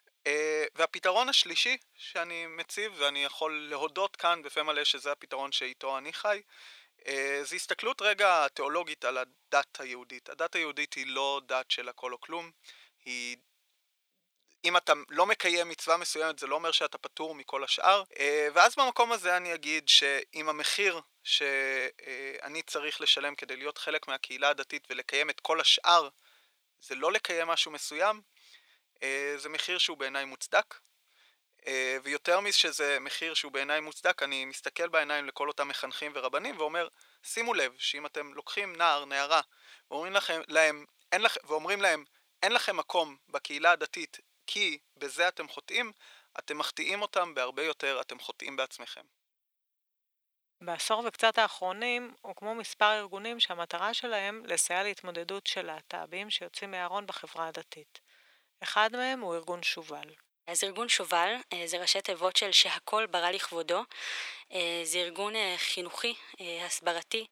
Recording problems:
thin; very; fading below 550 Hz

